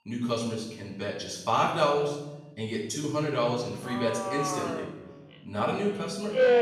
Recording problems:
off-mic speech; far
room echo; noticeable; dies away in 0.9 s
alarms or sirens; loud; throughout; 1 dB below the speech

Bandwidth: 15 kHz